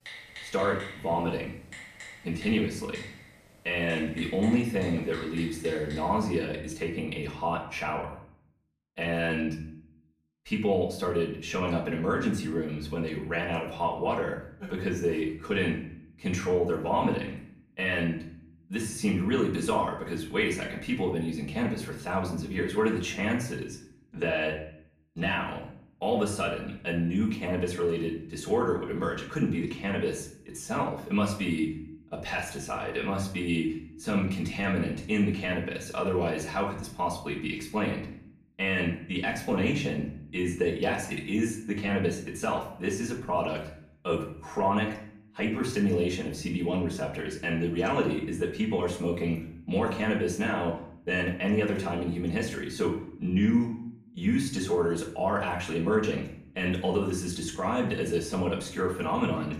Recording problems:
off-mic speech; far
room echo; slight; dies away in 0.5 s
keyboard typing; faint; until 6 s; peak 10 dB below the speech

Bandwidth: 15 kHz